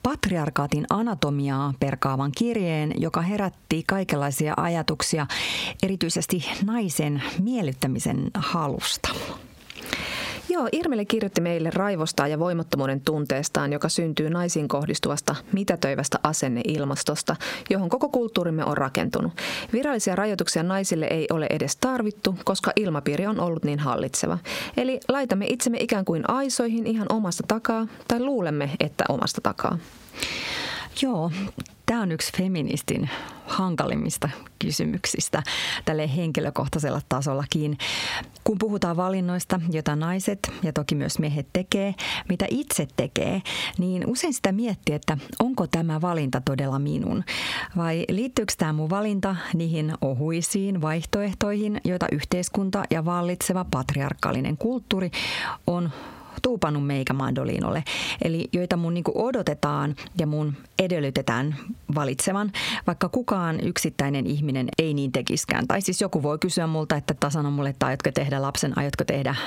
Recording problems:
squashed, flat; heavily

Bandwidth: 16 kHz